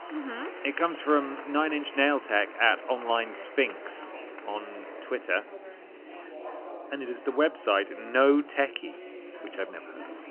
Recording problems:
phone-call audio; nothing above 3 kHz
chatter from many people; noticeable; throughout; 15 dB below the speech

